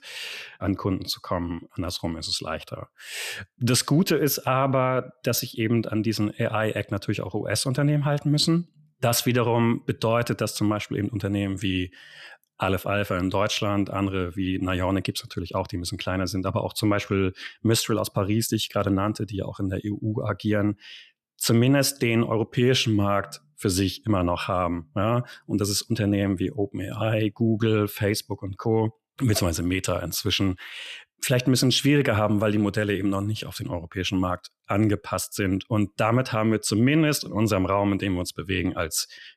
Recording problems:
none

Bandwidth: 14 kHz